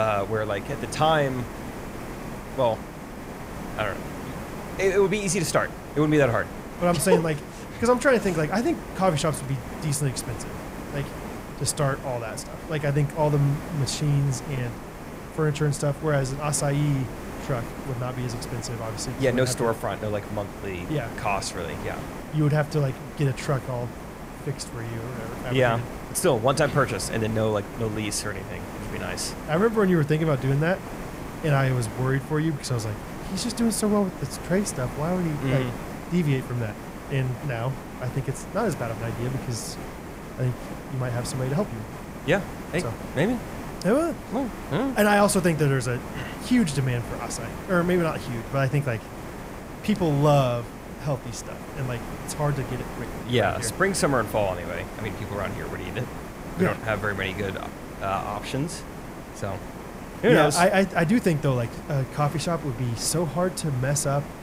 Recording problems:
hiss; noticeable; throughout; 10 dB below the speech
abrupt cut into speech; at the start

